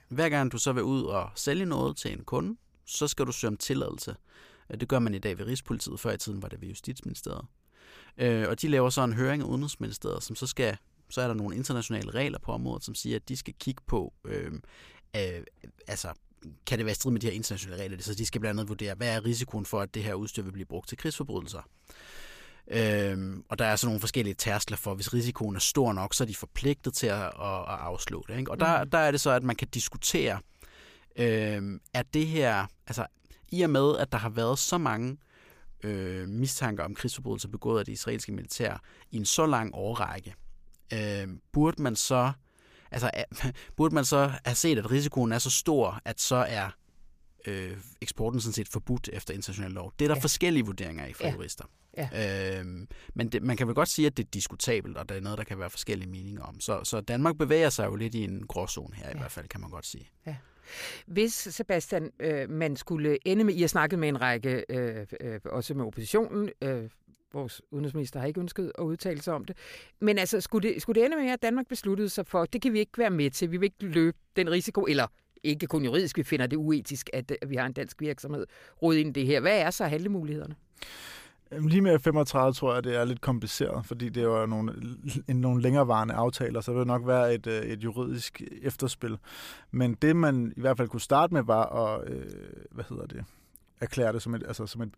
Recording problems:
none

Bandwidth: 15 kHz